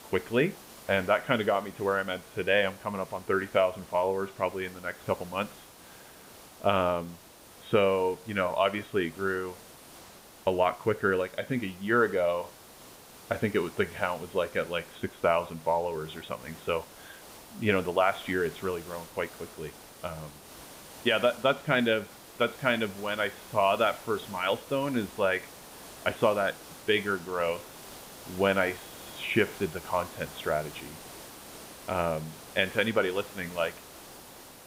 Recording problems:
high frequencies cut off; severe; nothing above 4 kHz
hiss; noticeable; throughout; 20 dB below the speech

